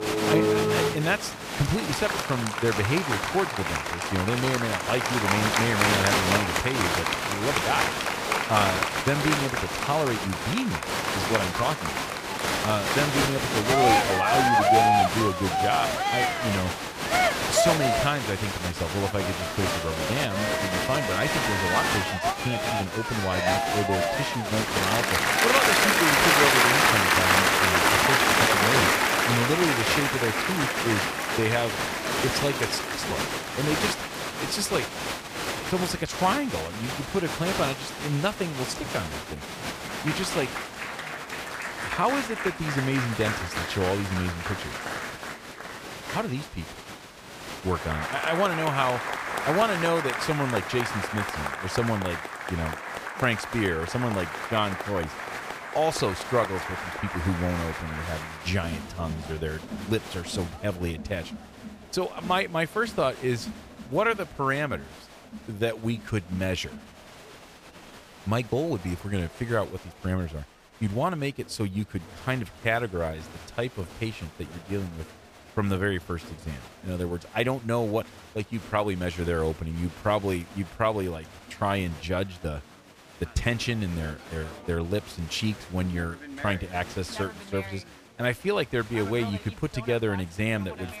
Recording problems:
crowd noise; very loud; throughout; 3 dB above the speech

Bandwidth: 15 kHz